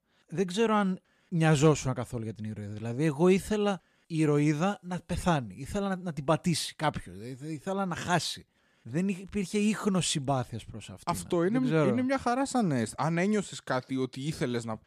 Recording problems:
none

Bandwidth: 14.5 kHz